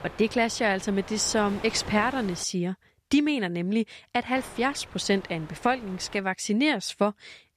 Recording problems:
wind noise on the microphone; occasional gusts; until 2.5 s and from 4.5 to 6 s; 15 dB below the speech

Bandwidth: 14.5 kHz